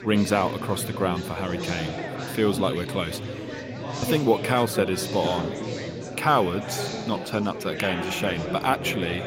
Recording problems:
chatter from many people; loud; throughout; 6 dB below the speech

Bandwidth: 16 kHz